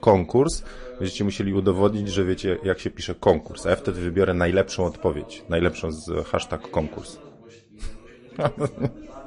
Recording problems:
garbled, watery; slightly; nothing above 10.5 kHz
background chatter; noticeable; throughout; 3 voices, 20 dB below the speech

